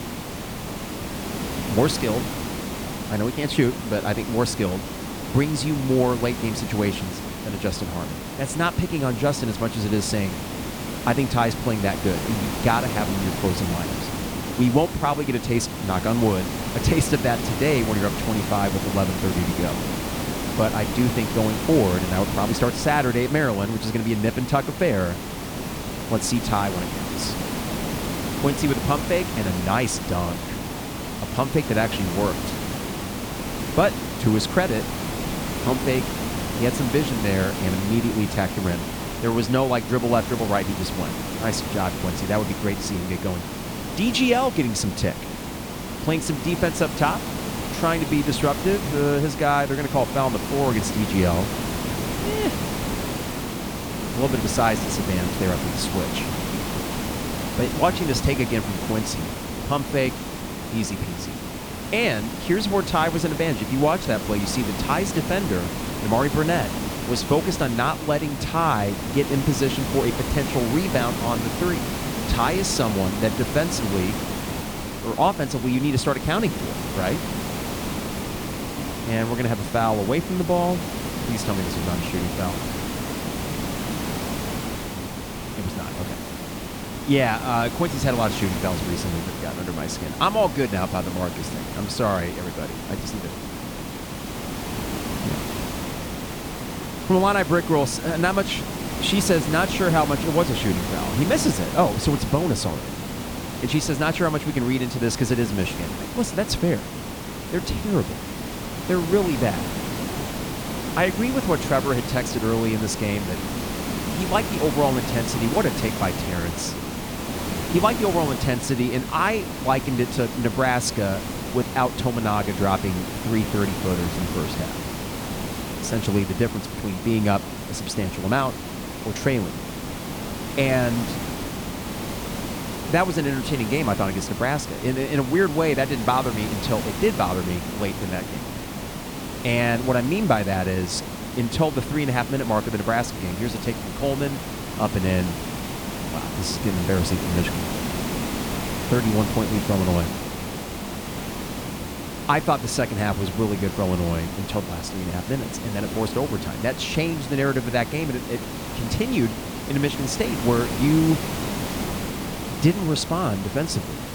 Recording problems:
hiss; loud; throughout; 5 dB below the speech

